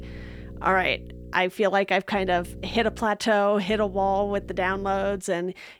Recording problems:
electrical hum; faint; until 1.5 s, at 2 s and from 3.5 to 5 s; 60 Hz, 25 dB below the speech

